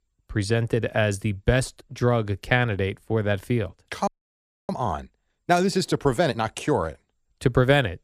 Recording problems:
audio freezing; at 4 s for 0.5 s

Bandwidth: 14.5 kHz